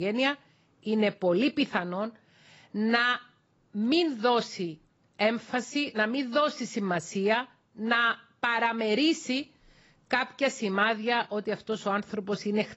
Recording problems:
garbled, watery; badly; nothing above 7.5 kHz
abrupt cut into speech; at the start

